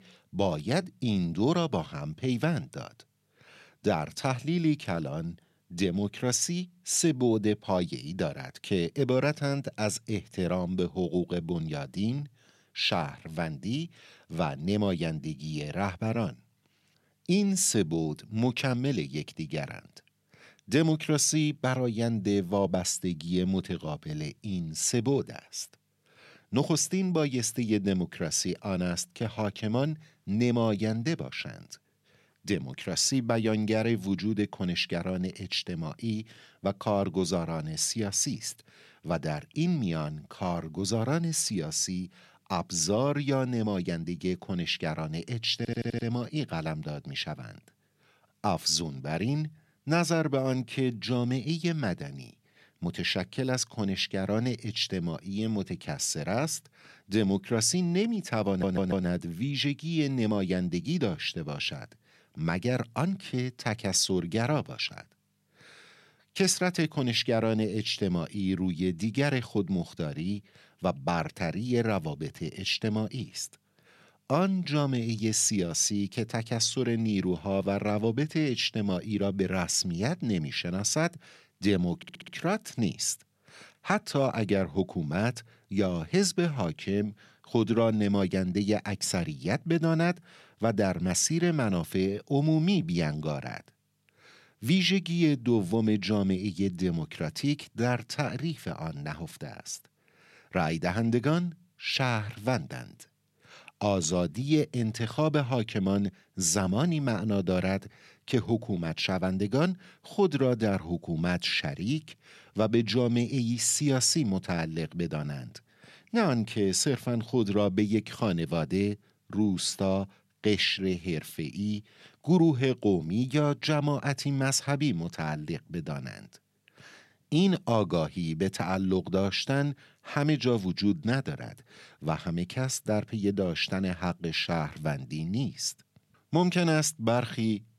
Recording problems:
audio stuttering; at 46 s, at 58 s and at 1:22

